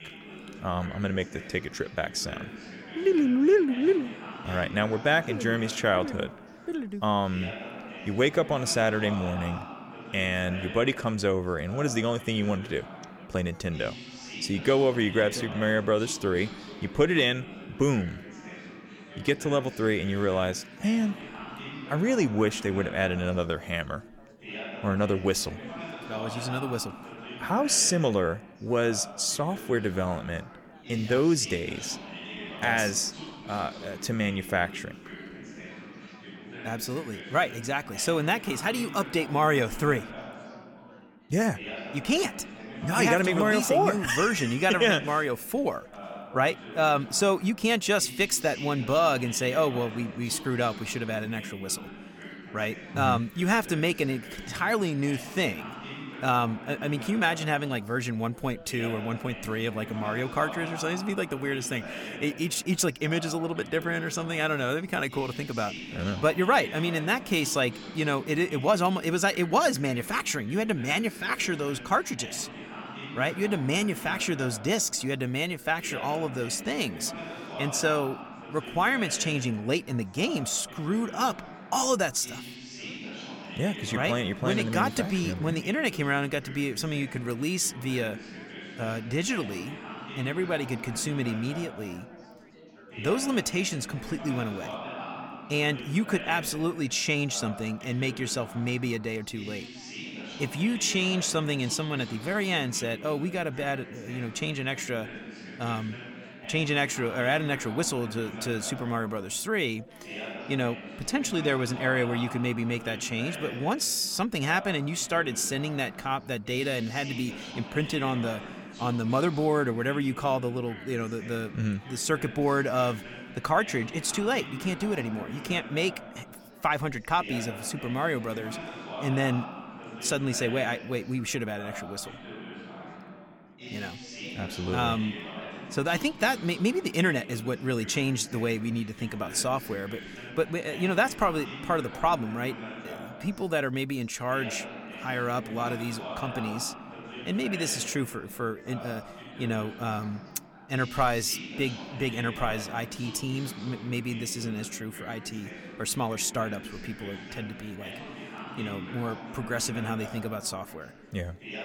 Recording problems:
chatter from many people; noticeable; throughout; 10 dB below the speech

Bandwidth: 17.5 kHz